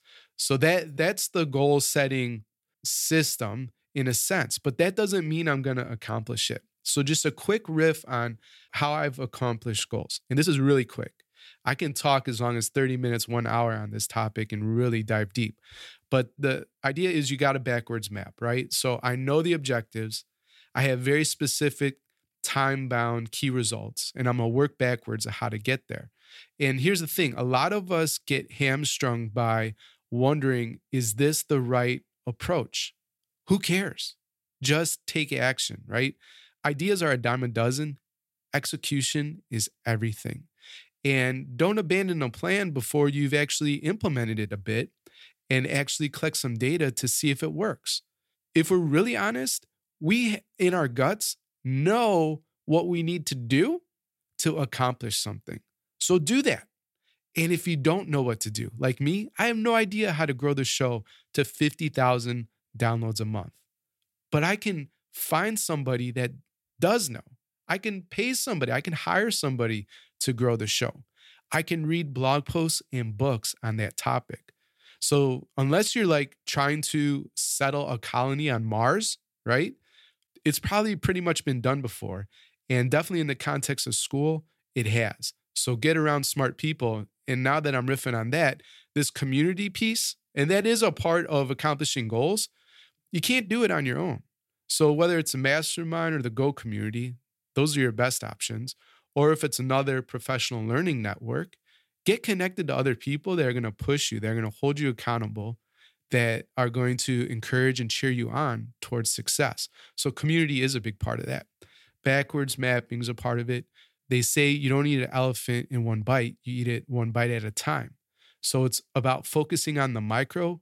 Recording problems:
uneven, jittery; strongly; from 10 s to 1:53

